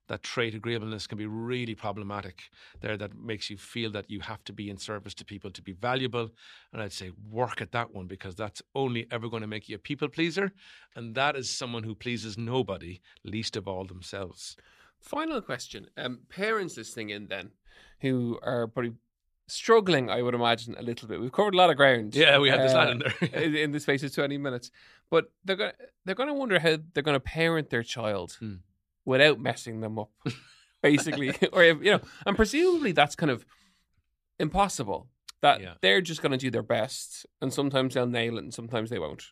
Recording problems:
none

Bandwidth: 14.5 kHz